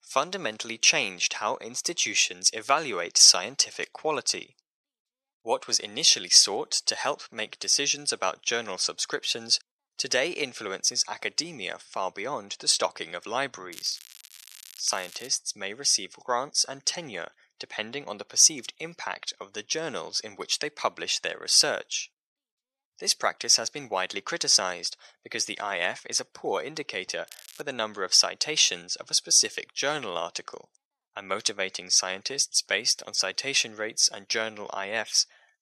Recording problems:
thin; very; fading below 800 Hz
crackling; faint; from 14 to 15 s and at 27 s; 20 dB below the speech

